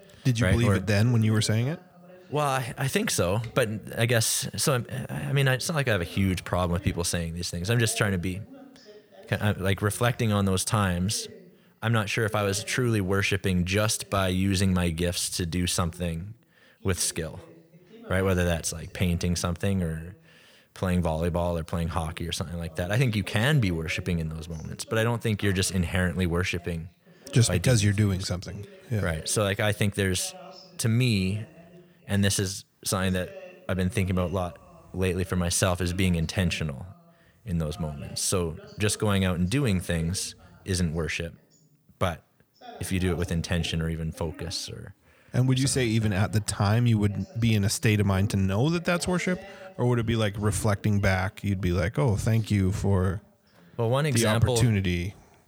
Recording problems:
voice in the background; faint; throughout; 25 dB below the speech

